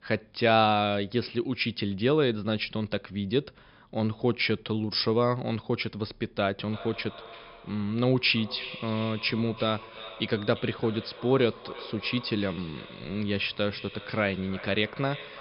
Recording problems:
echo of what is said; noticeable; from 6.5 s on; 340 ms later, 15 dB below the speech
high frequencies cut off; noticeable; nothing above 5.5 kHz

